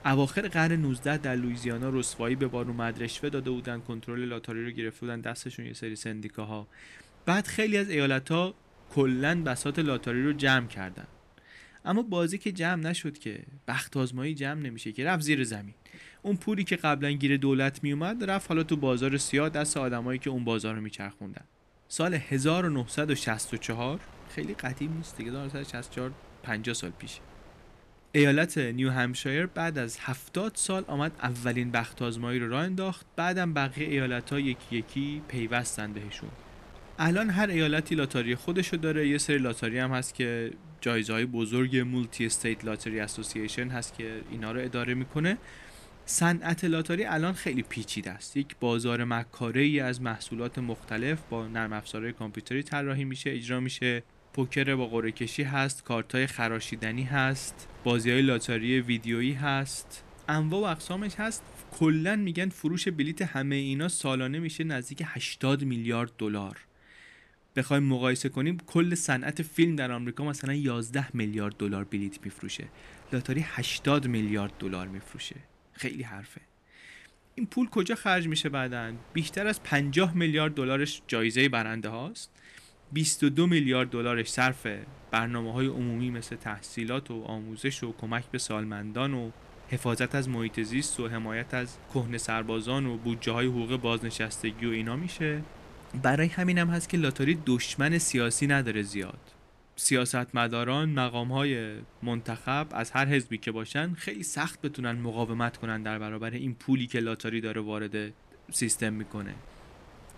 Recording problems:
wind noise on the microphone; occasional gusts; 25 dB below the speech

